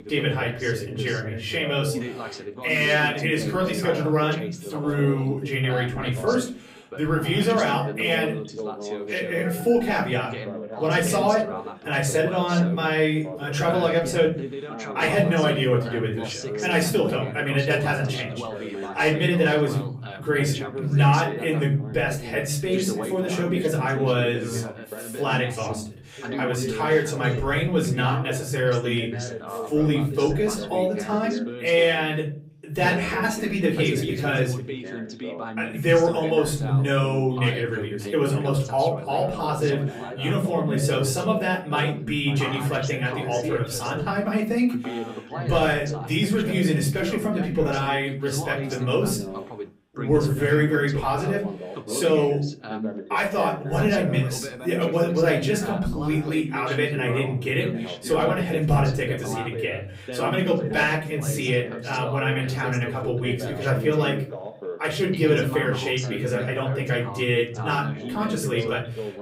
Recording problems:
off-mic speech; far
room echo; slight; dies away in 0.5 s
background chatter; loud; throughout; 2 voices, 10 dB below the speech

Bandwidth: 15.5 kHz